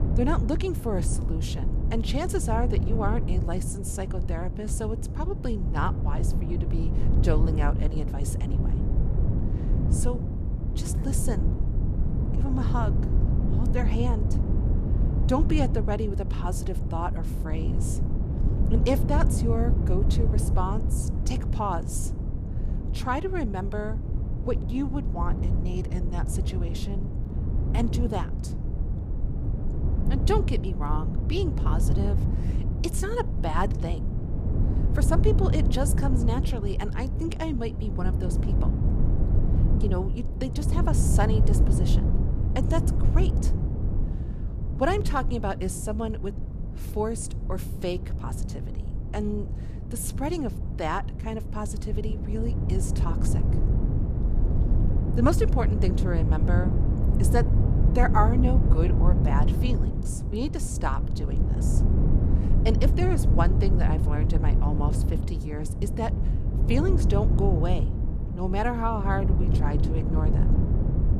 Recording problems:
wind noise on the microphone; heavy; 6 dB below the speech

